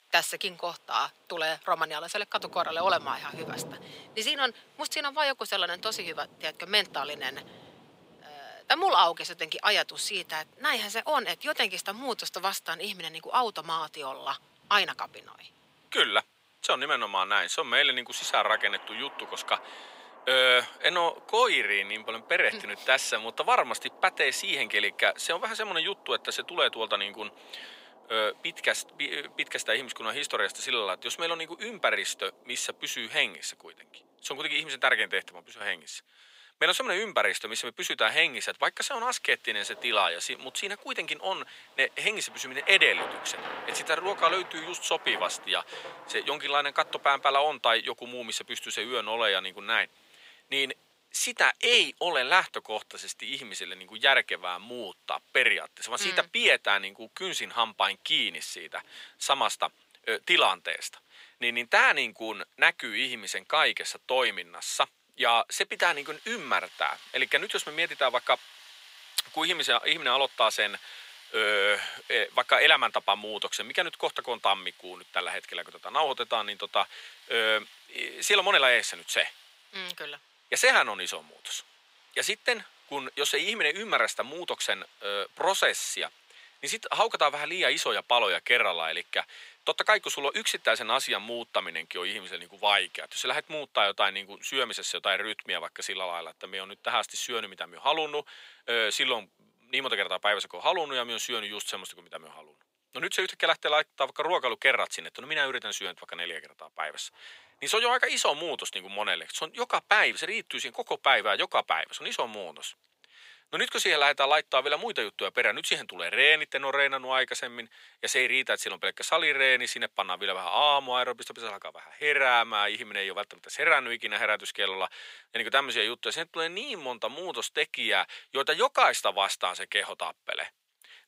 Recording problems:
thin; very; fading below 850 Hz
rain or running water; faint; throughout; 25 dB below the speech

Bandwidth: 15.5 kHz